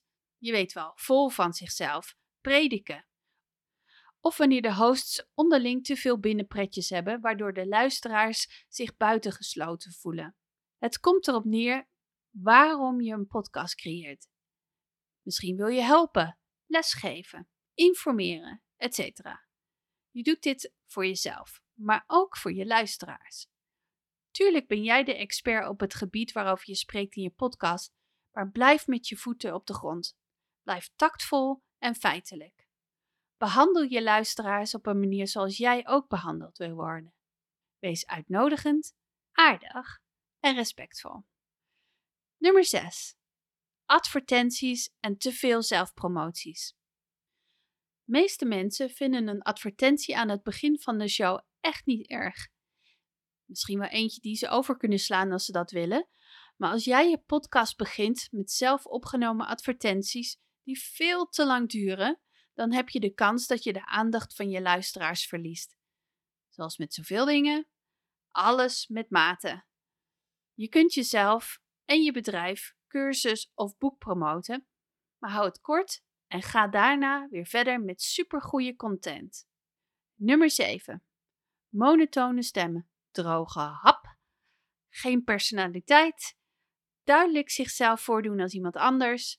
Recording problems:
none

